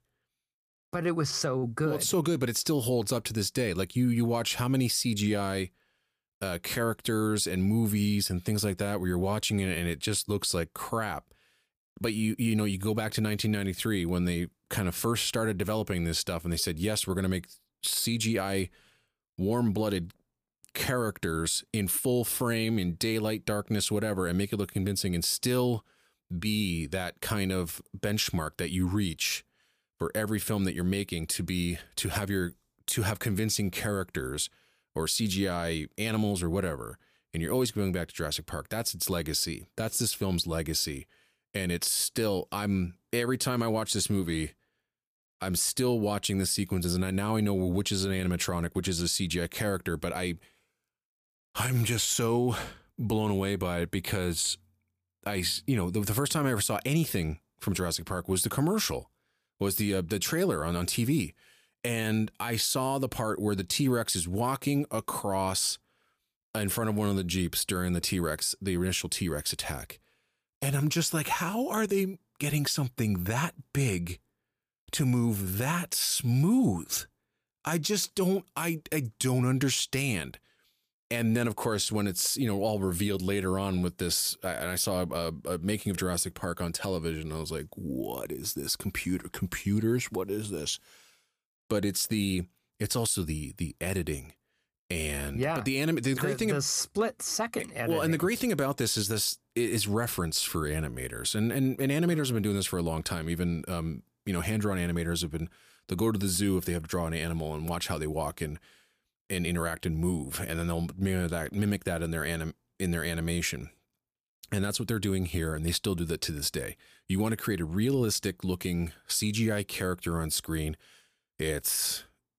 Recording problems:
none

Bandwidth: 15 kHz